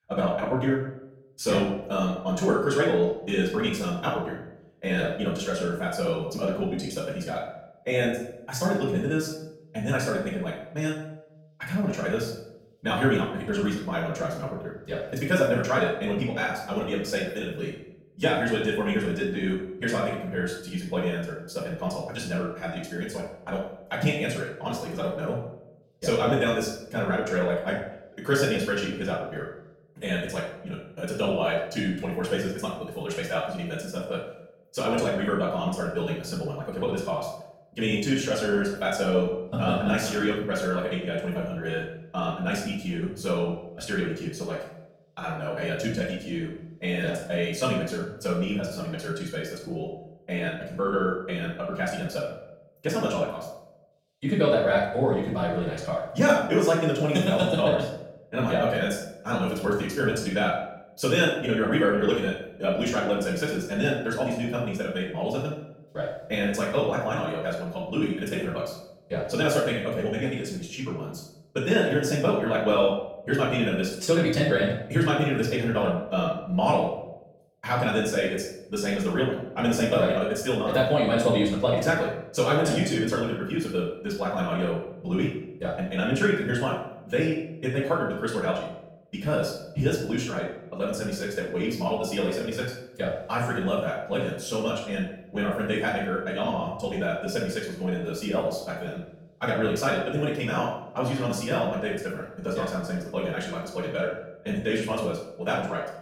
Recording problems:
off-mic speech; far
wrong speed, natural pitch; too fast; 1.7 times normal speed
room echo; noticeable; dies away in 0.6 s

